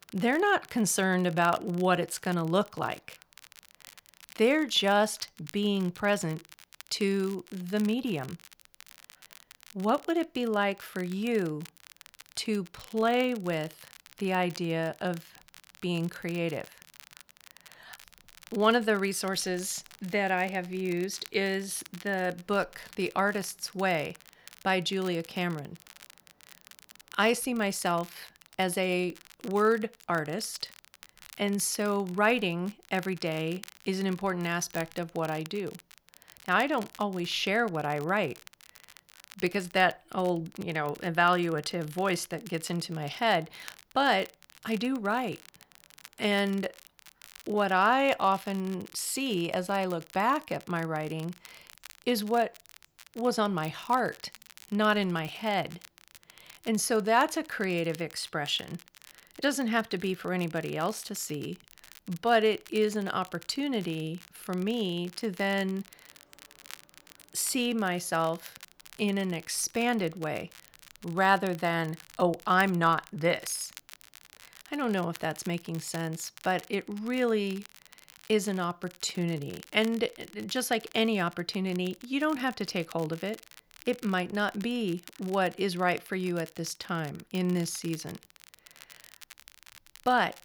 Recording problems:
crackle, like an old record; faint; 20 dB below the speech

